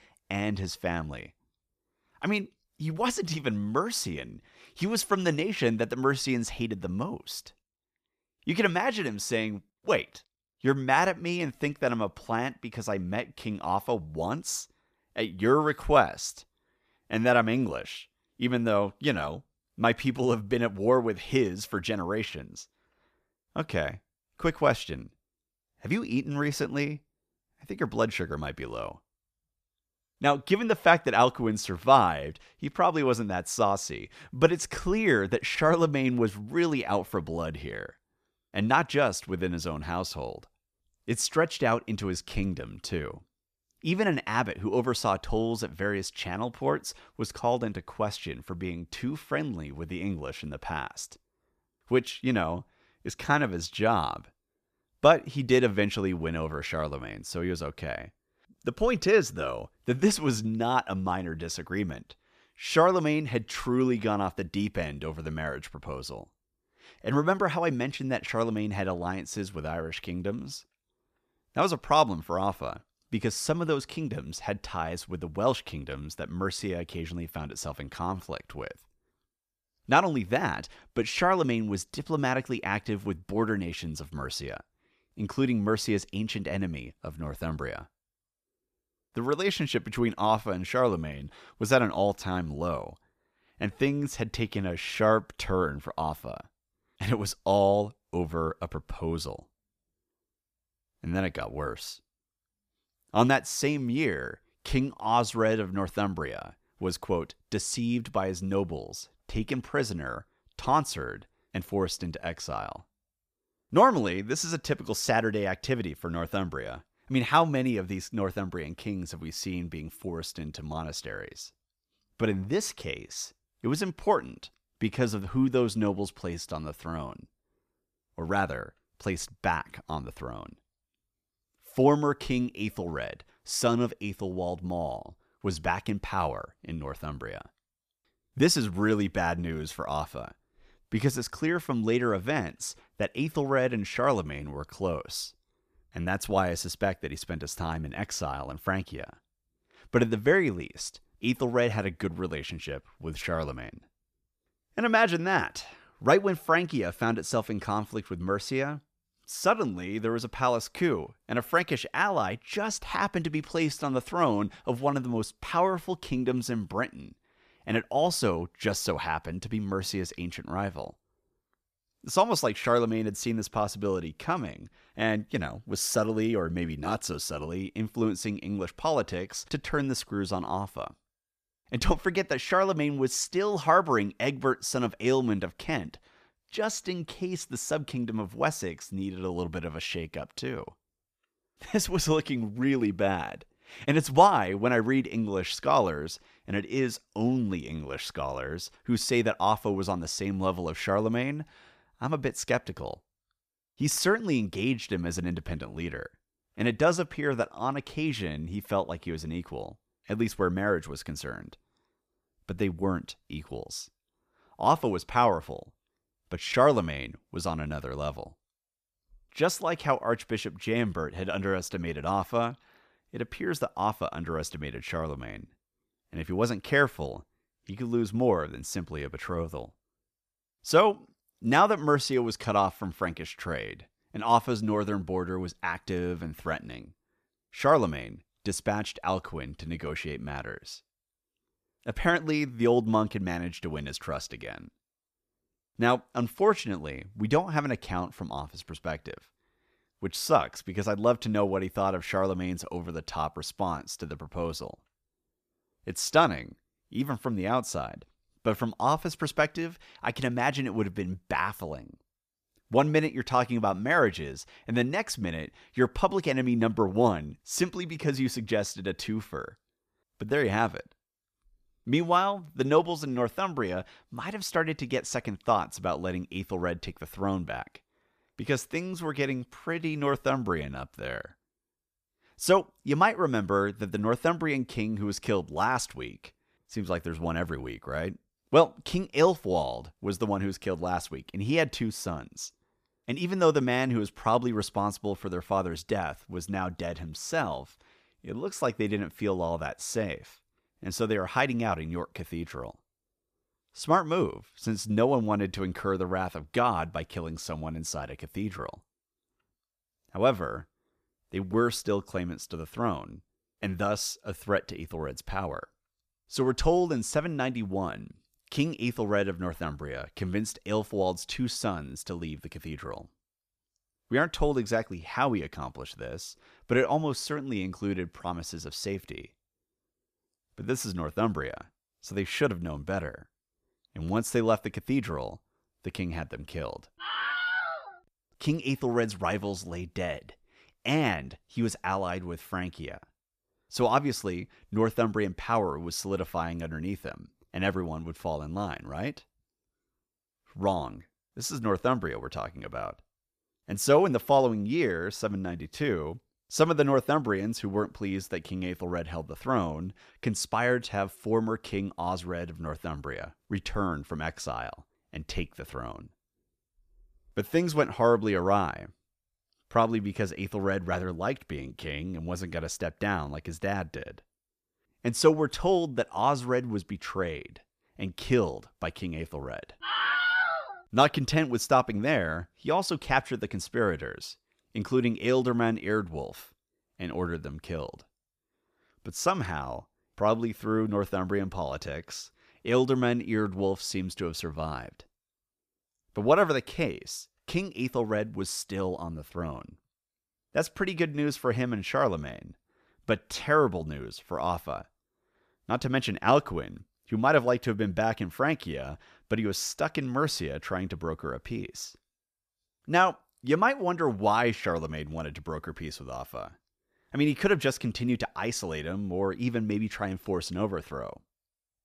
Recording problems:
none

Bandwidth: 14.5 kHz